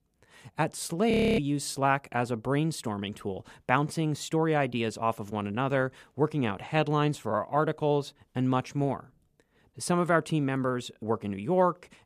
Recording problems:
audio freezing; at 1 s

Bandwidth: 14.5 kHz